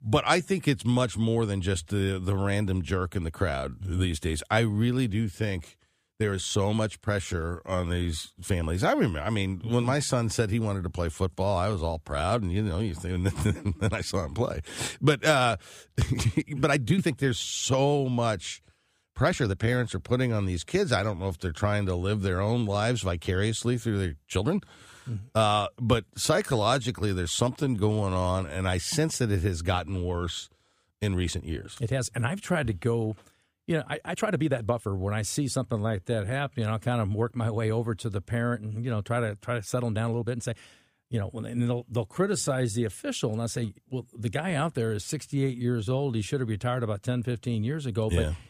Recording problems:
uneven, jittery; strongly; from 2 to 46 s

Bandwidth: 15 kHz